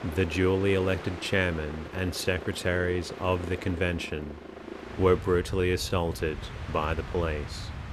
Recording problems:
train or aircraft noise; noticeable; throughout; 10 dB below the speech

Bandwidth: 14.5 kHz